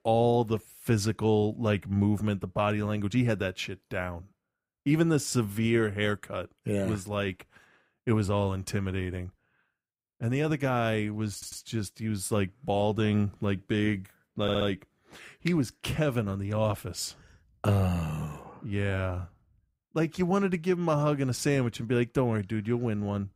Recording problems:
audio stuttering; at 11 s and at 14 s

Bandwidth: 15.5 kHz